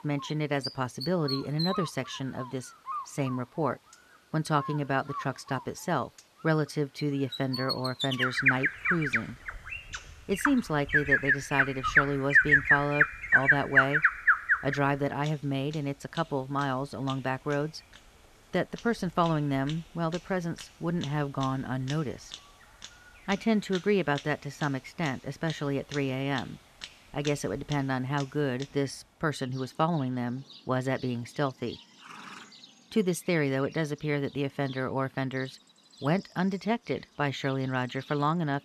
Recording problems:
animal sounds; very loud; throughout; 3 dB above the speech

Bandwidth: 14 kHz